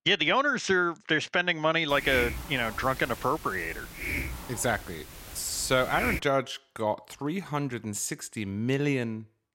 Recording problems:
hiss; loud; from 2 to 6 s; 8 dB below the speech

